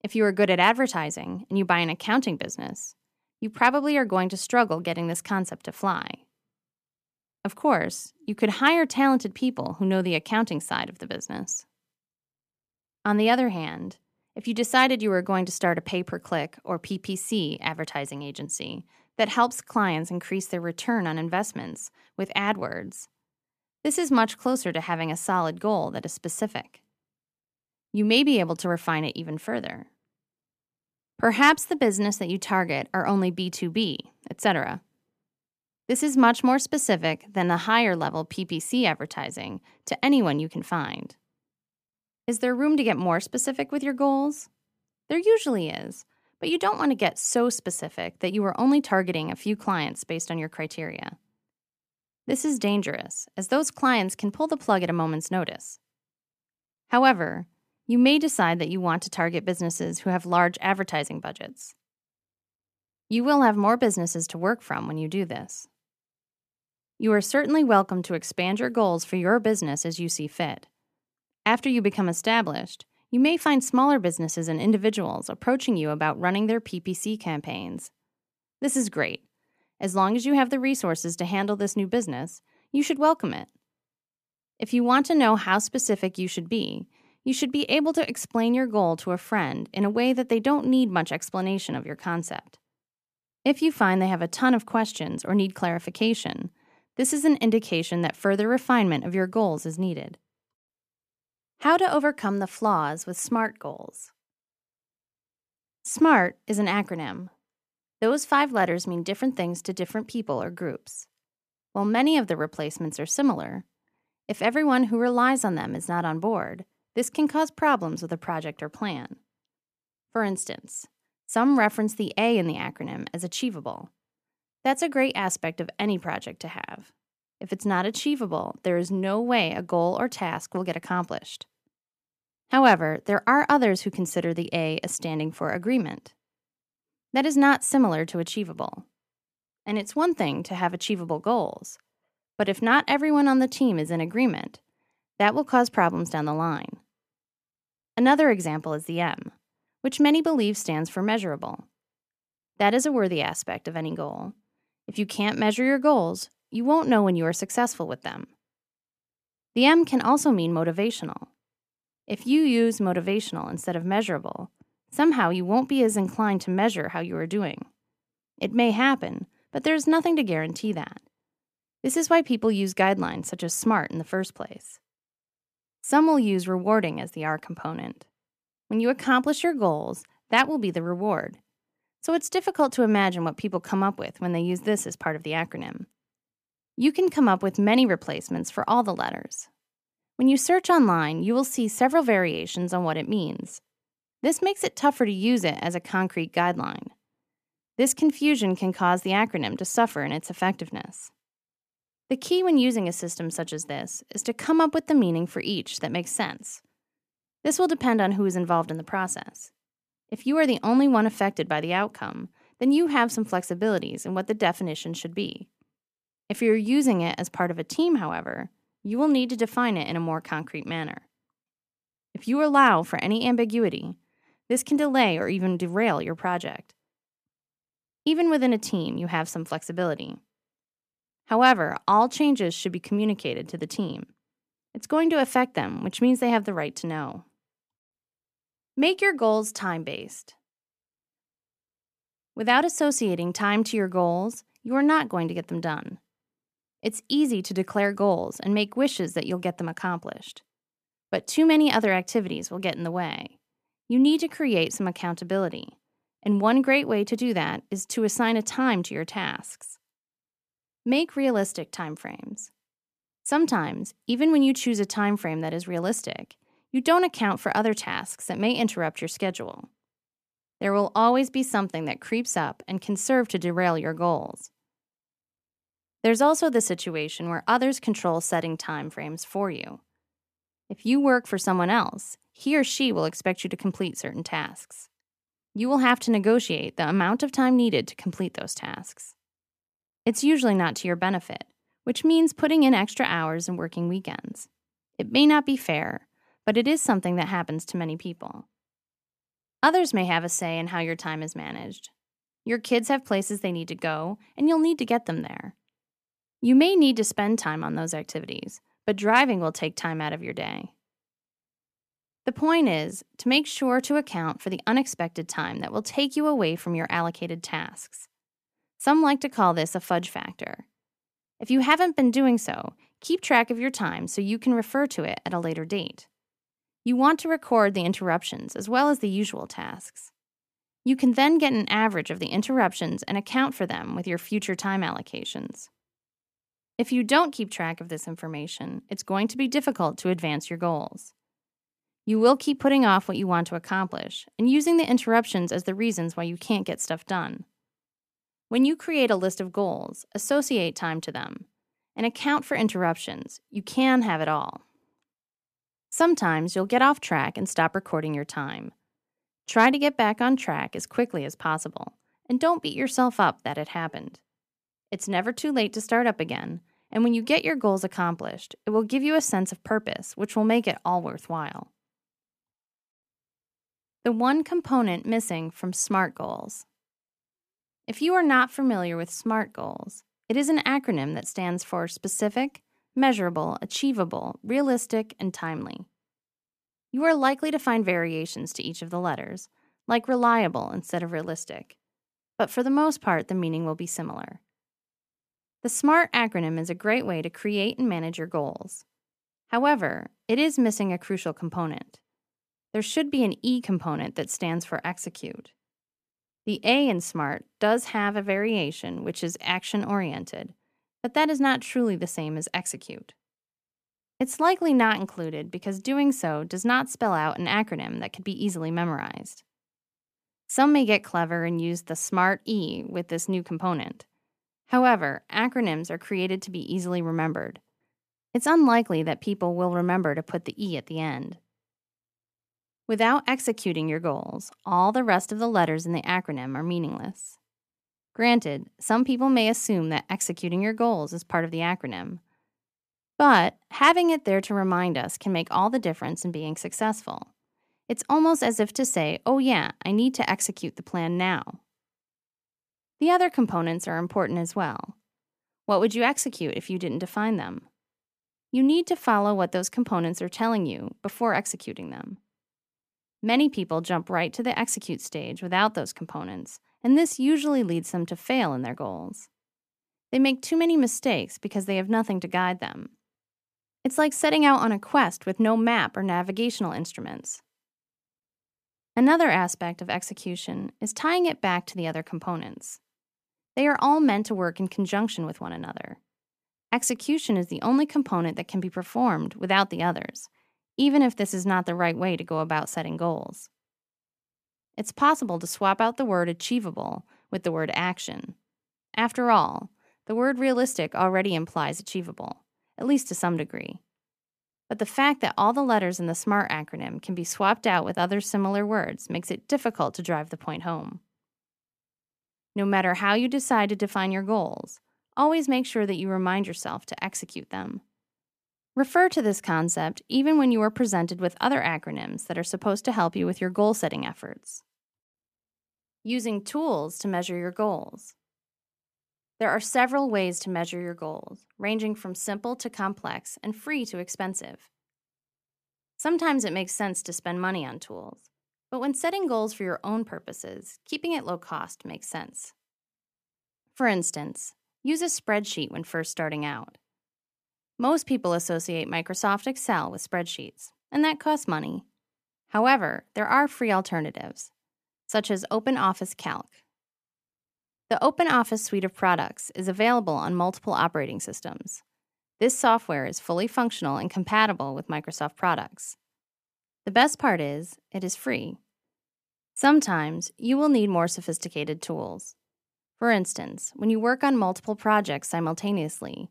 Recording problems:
none

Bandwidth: 14.5 kHz